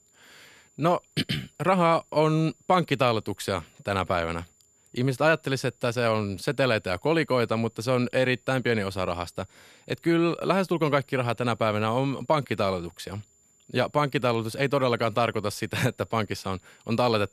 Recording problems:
high-pitched whine; faint; throughout; 7 kHz, 35 dB below the speech

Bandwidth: 14.5 kHz